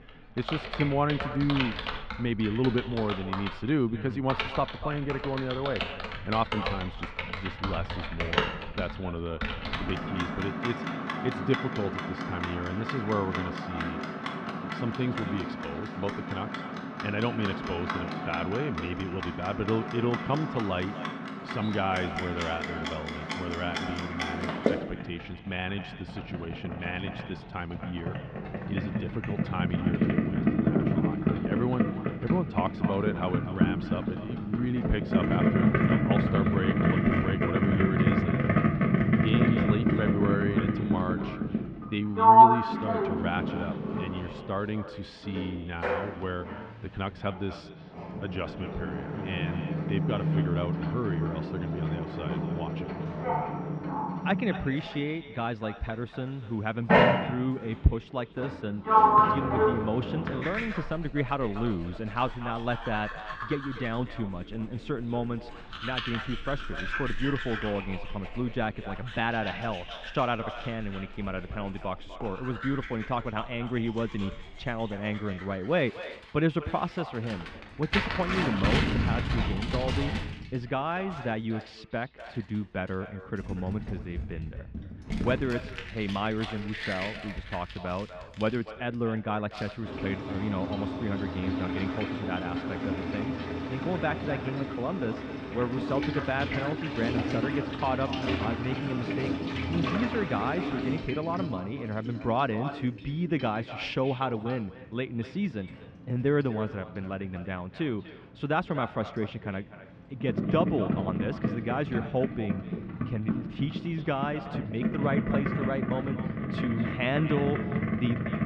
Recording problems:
muffled; very; fading above 3 kHz
echo of what is said; noticeable; throughout; 240 ms later, 15 dB below the speech
household noises; very loud; throughout; 3 dB above the speech

